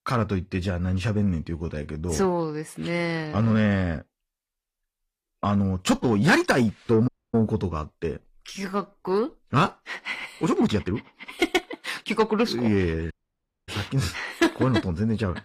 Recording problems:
distortion; slight; 10 dB below the speech
garbled, watery; slightly; nothing above 14.5 kHz
uneven, jittery; strongly; from 1.5 to 12 s
audio cutting out; at 7 s and at 13 s for 0.5 s

